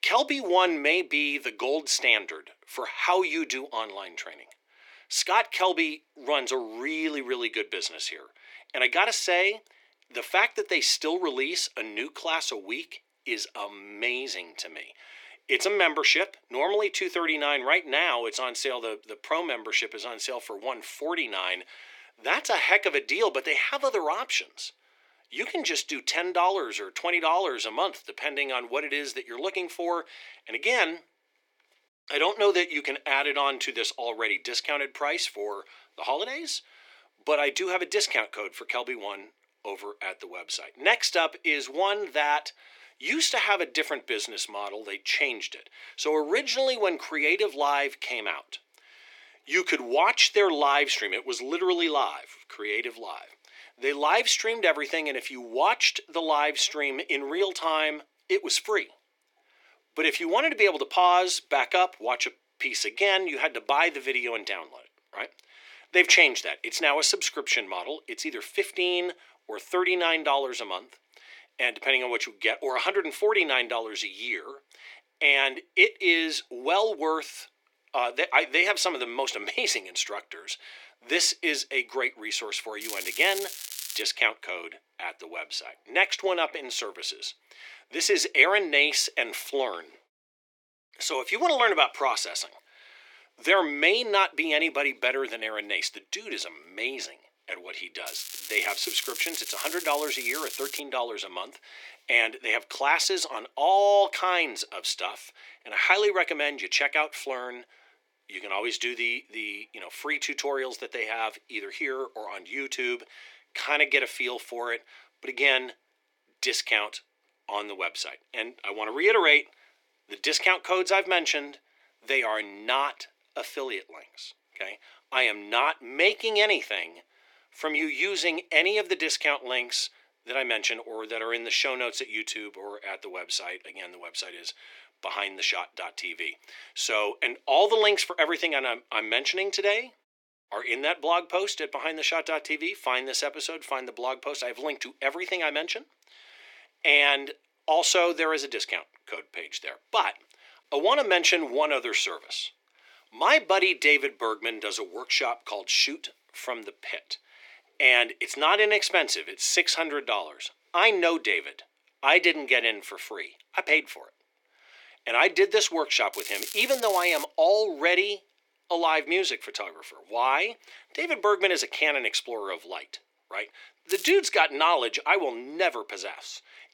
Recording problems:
thin; very; fading below 350 Hz
crackling; loud; 4 times, first at 1:23; 10 dB below the speech

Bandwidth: 17 kHz